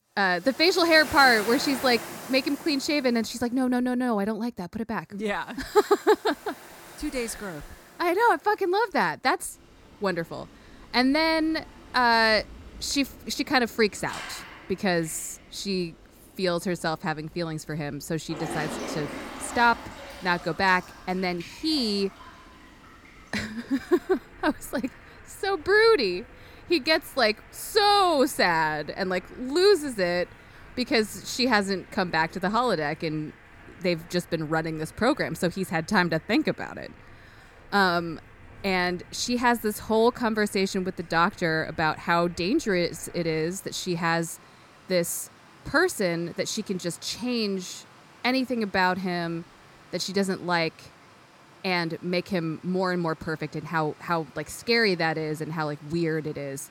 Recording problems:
rain or running water; noticeable; throughout; 20 dB below the speech

